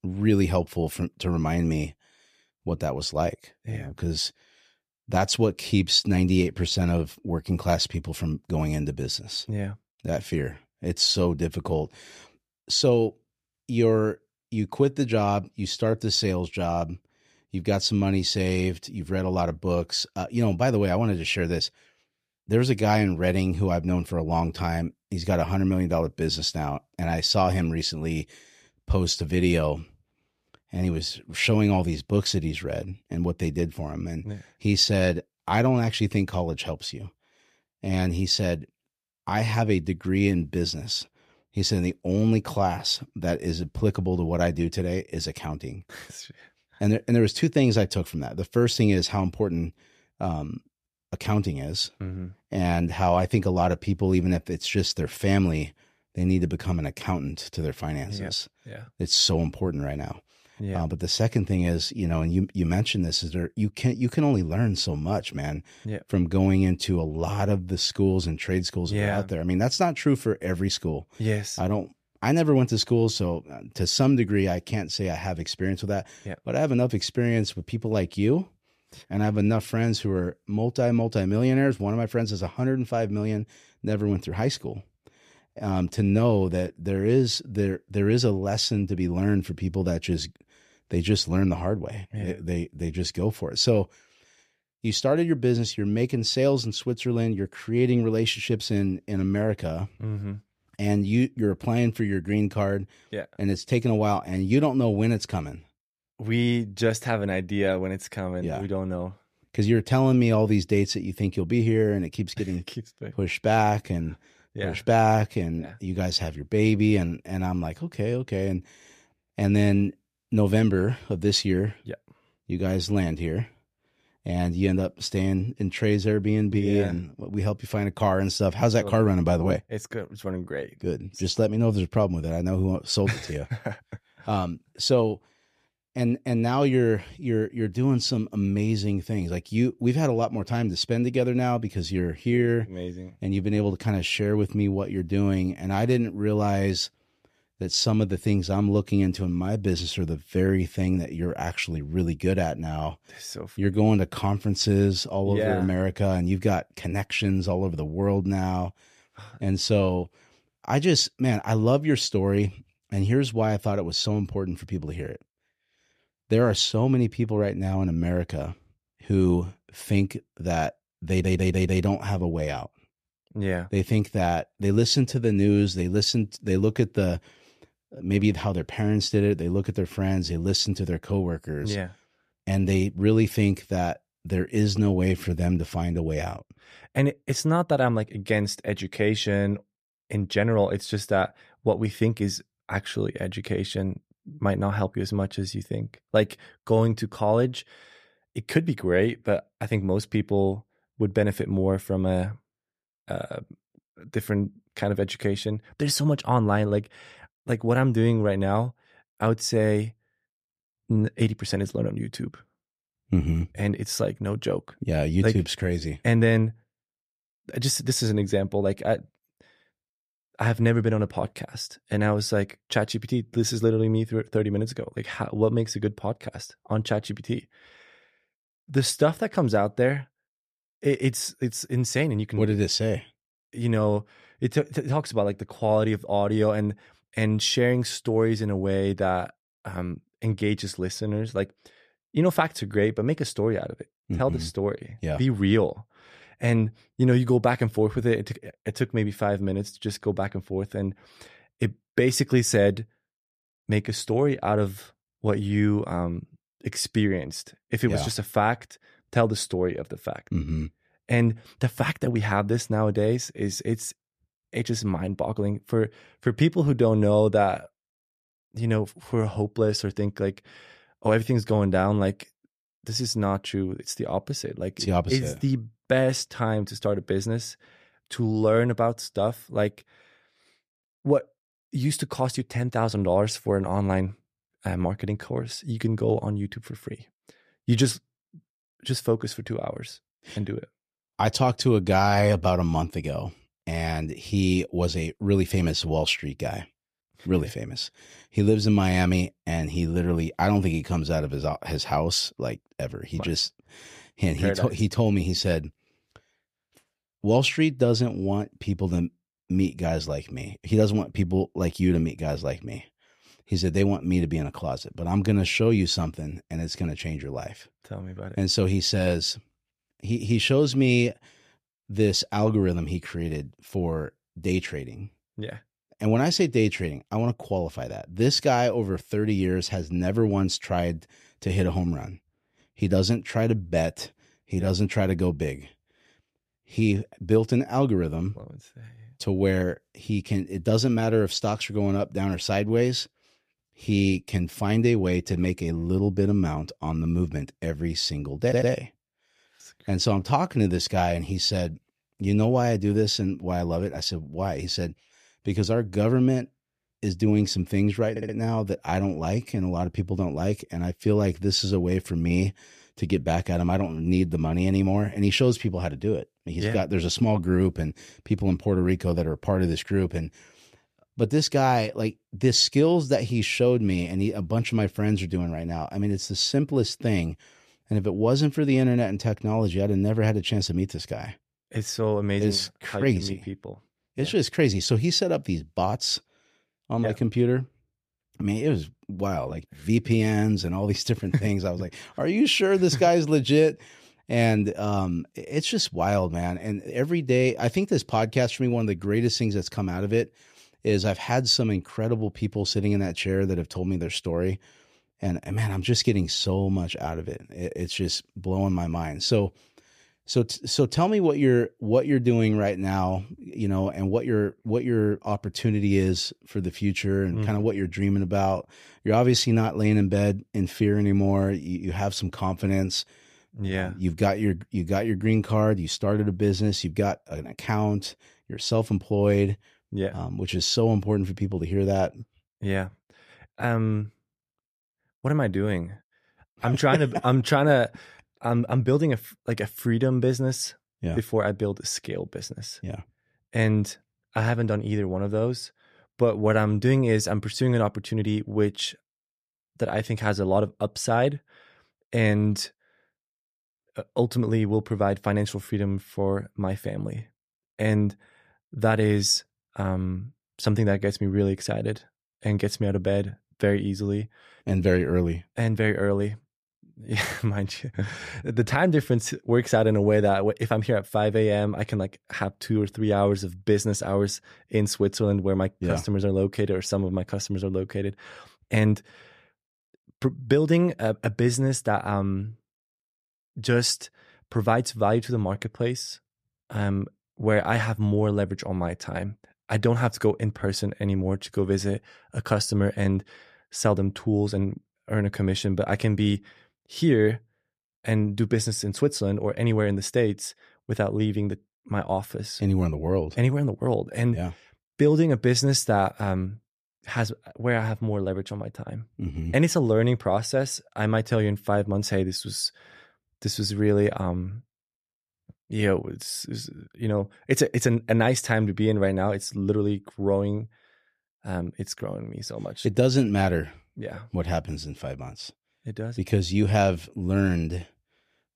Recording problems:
audio stuttering; at 2:51, at 5:48 and at 5:58

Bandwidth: 14.5 kHz